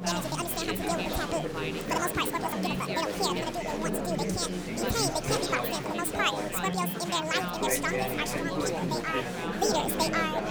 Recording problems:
wrong speed and pitch; too fast and too high; 1.7 times normal speed
chatter from many people; loud; throughout; 1 dB below the speech

